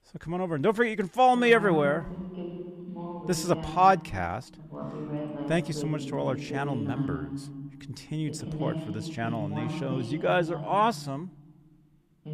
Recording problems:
voice in the background; loud; throughout; 9 dB below the speech

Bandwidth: 14.5 kHz